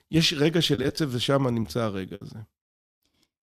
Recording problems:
choppy; very; at 1 s and at 1.5 s; 9% of the speech affected

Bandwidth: 14.5 kHz